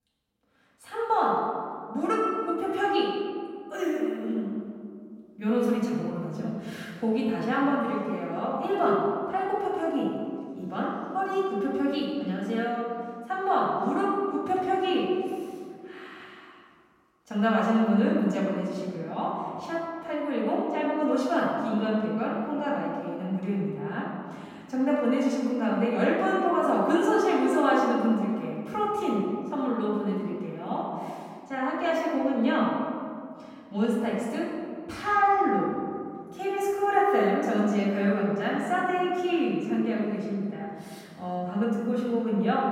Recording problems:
off-mic speech; far
room echo; noticeable; dies away in 1.9 s

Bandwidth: 16 kHz